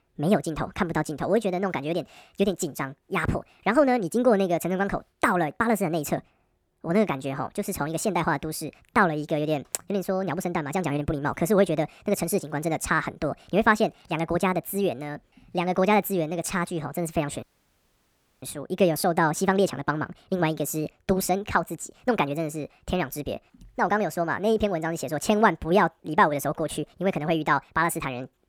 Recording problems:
wrong speed and pitch; too fast and too high; 1.5 times normal speed
audio cutting out; at 17 s for 1 s

